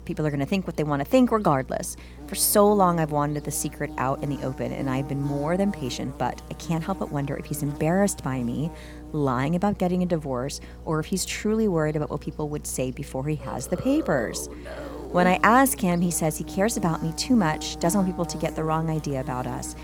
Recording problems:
electrical hum; noticeable; throughout; 60 Hz, 20 dB below the speech

